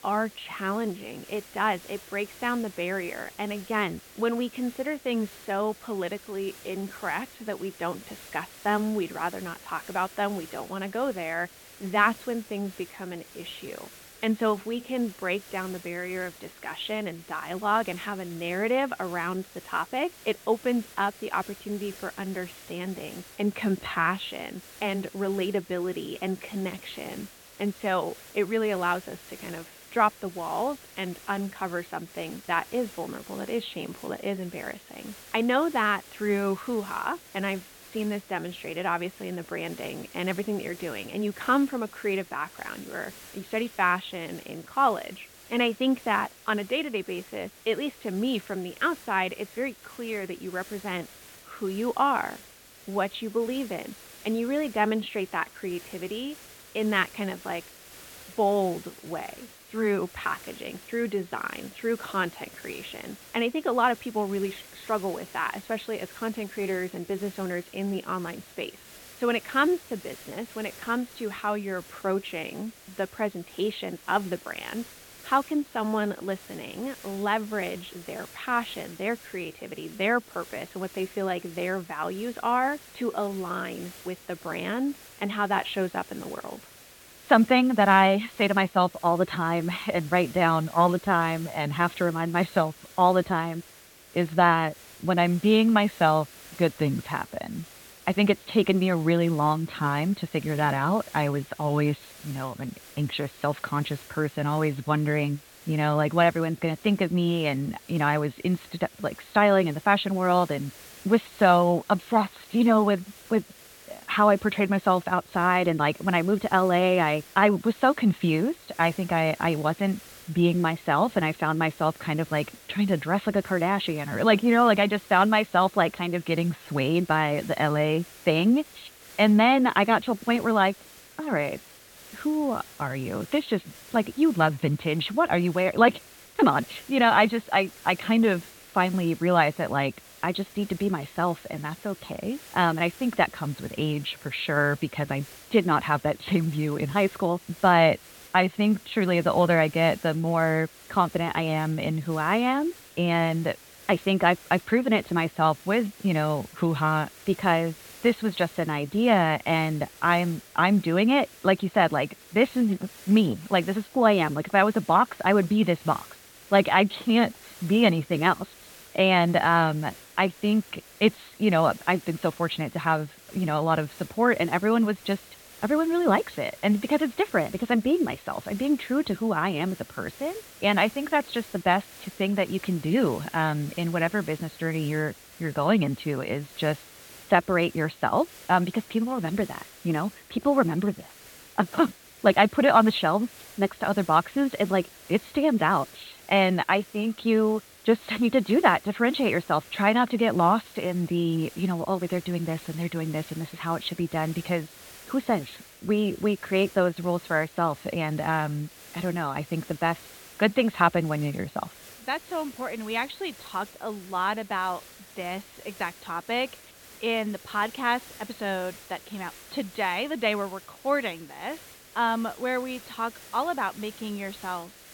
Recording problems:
high frequencies cut off; severe; nothing above 4.5 kHz
hiss; faint; throughout; 20 dB below the speech

